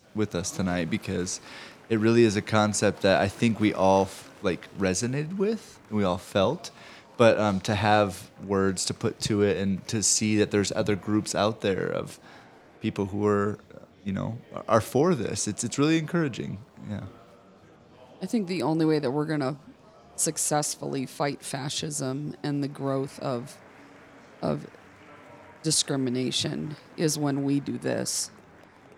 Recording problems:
murmuring crowd; faint; throughout; 25 dB below the speech

